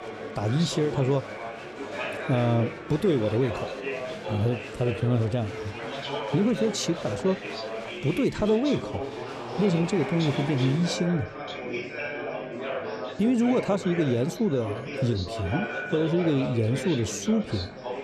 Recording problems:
chatter from many people; loud; throughout; 7 dB below the speech

